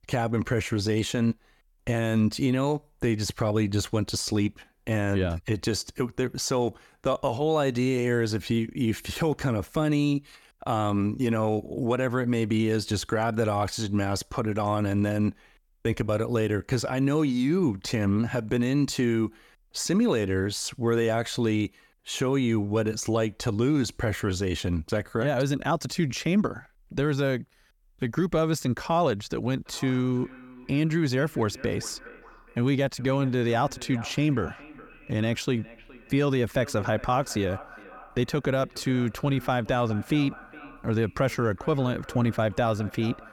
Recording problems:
echo of what is said; faint; from 30 s on; 420 ms later, 20 dB below the speech

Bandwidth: 18 kHz